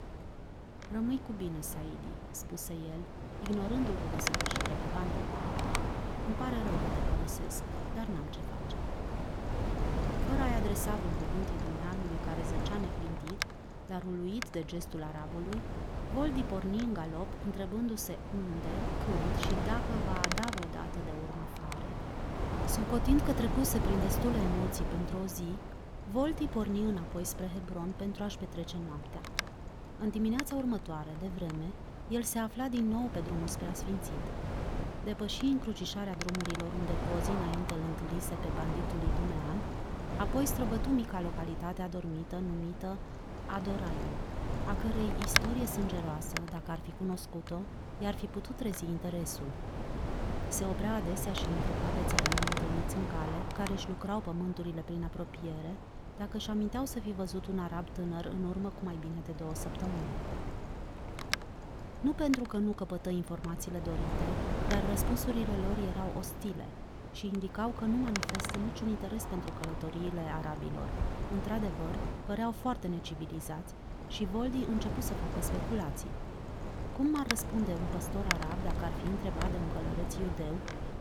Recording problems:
wind noise on the microphone; heavy; as loud as the speech

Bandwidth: 18 kHz